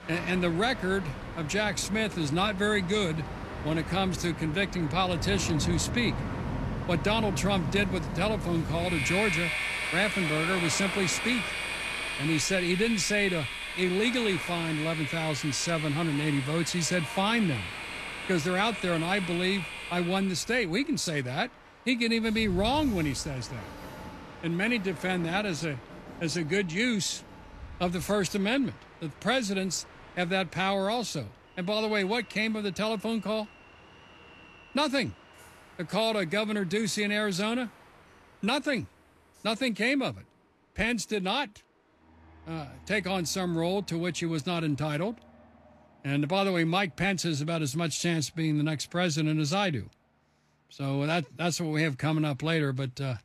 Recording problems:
train or aircraft noise; loud; throughout; 6 dB below the speech

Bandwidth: 13.5 kHz